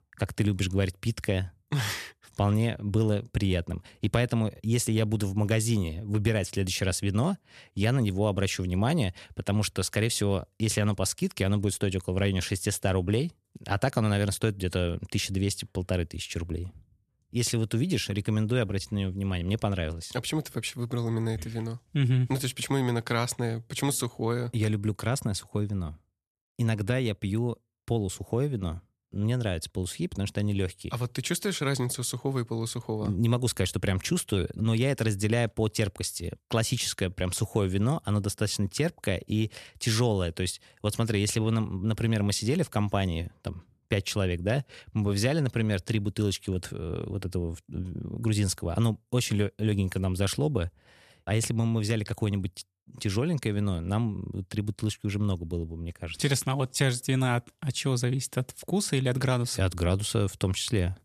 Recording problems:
none

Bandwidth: 13.5 kHz